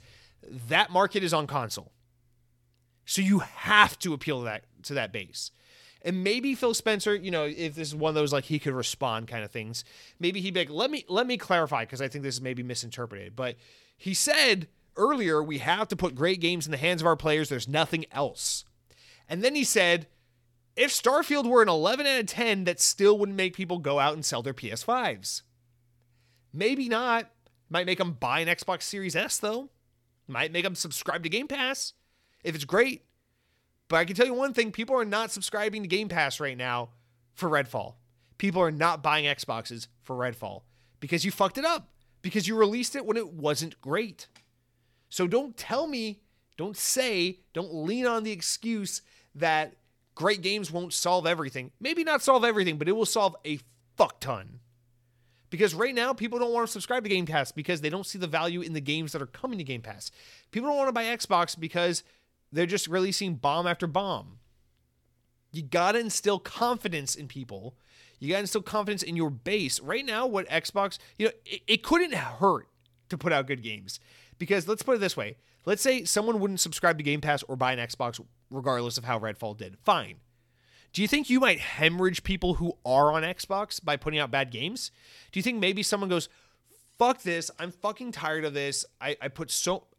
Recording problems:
none

